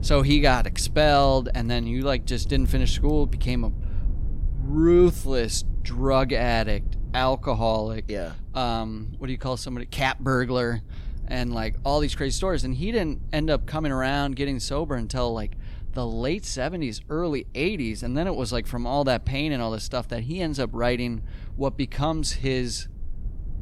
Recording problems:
low rumble; faint; throughout; 25 dB below the speech

